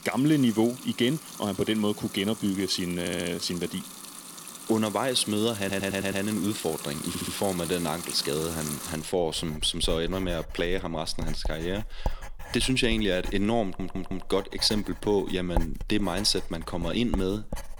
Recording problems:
household noises; noticeable; throughout; 10 dB below the speech
audio stuttering; 4 times, first at 3 s

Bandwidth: 18 kHz